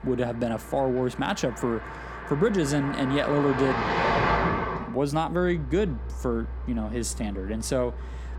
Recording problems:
traffic noise; loud; throughout; 3 dB below the speech

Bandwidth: 17.5 kHz